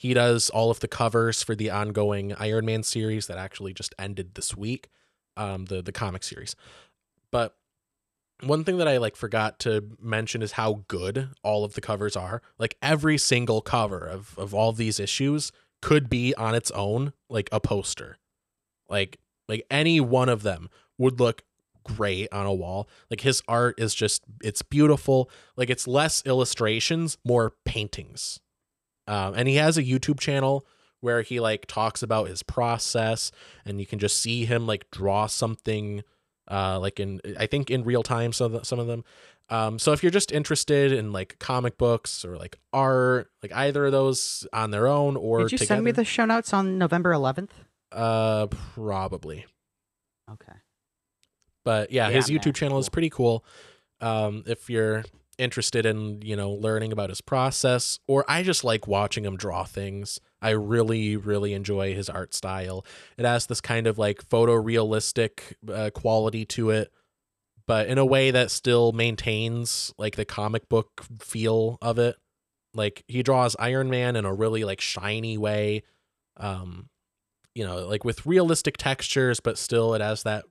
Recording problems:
none

